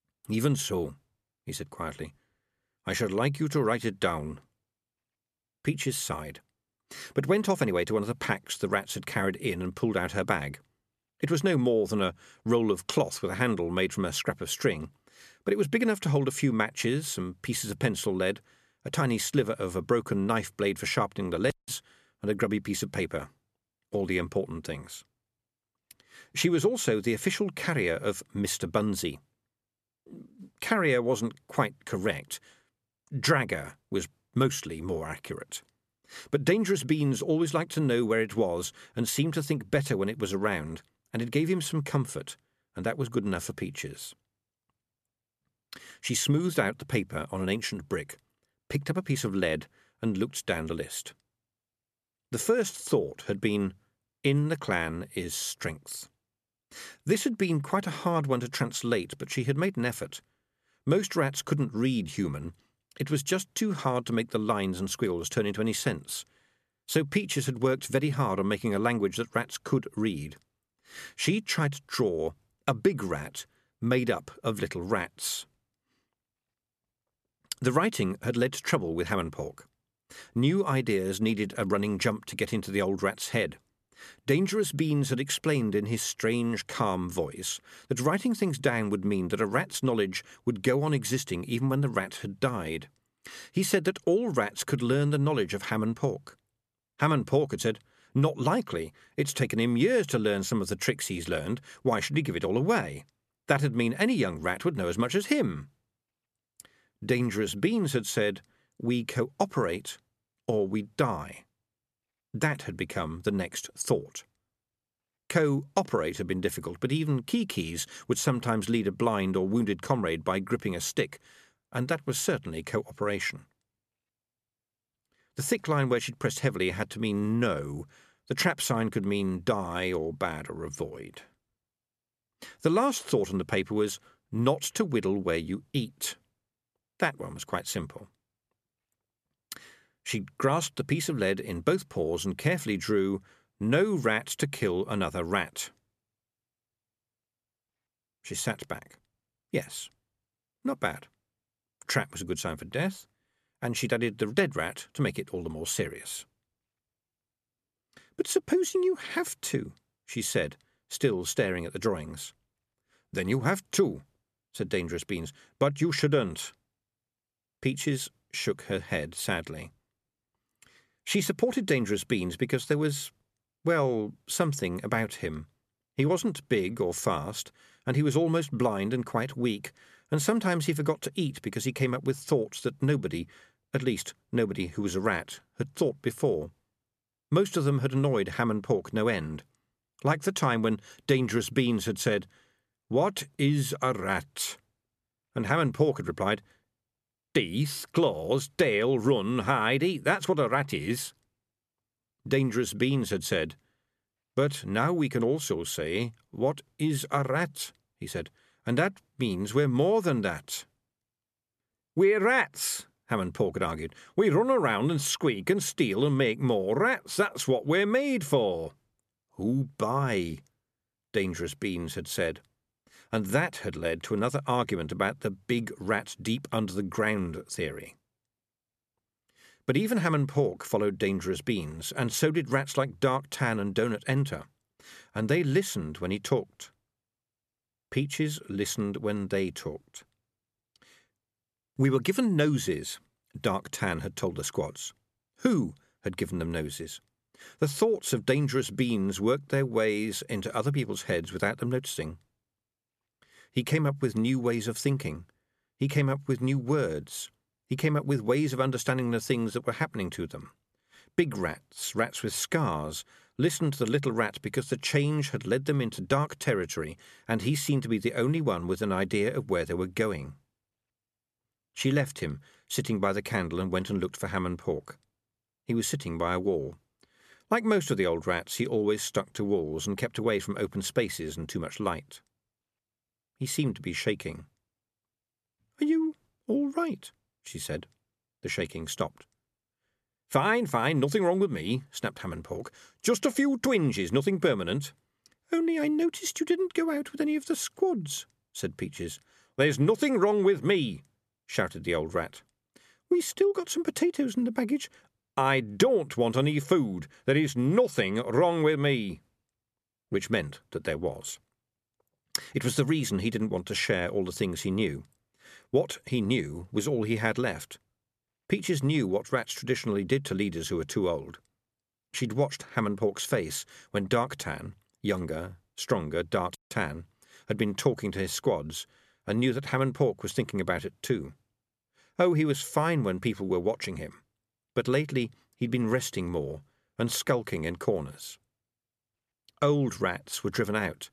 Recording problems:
none

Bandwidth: 14 kHz